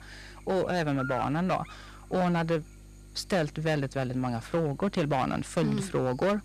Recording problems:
distortion; slight; 6% of the sound clipped
electrical hum; noticeable; throughout; 50 Hz, 10 dB below the speech

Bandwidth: 14 kHz